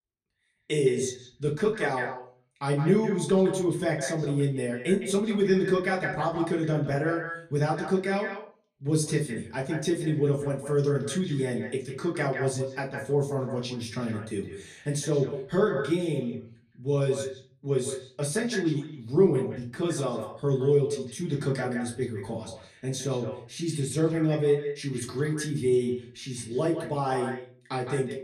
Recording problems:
echo of what is said; strong; throughout; 160 ms later, 10 dB below the speech
off-mic speech; far
room echo; very slight; dies away in 0.3 s

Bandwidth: 14.5 kHz